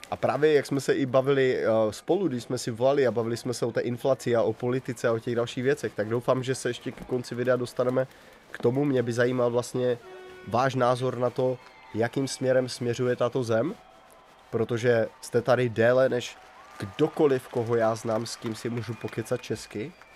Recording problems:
crowd noise; faint; throughout; 25 dB below the speech

